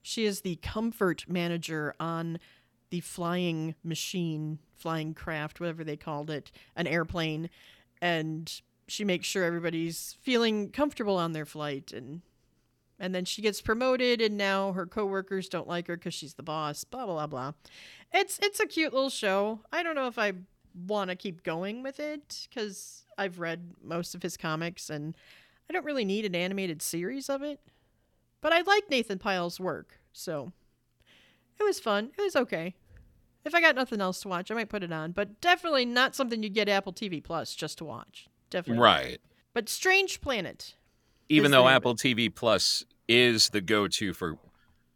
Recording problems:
none

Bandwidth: 18.5 kHz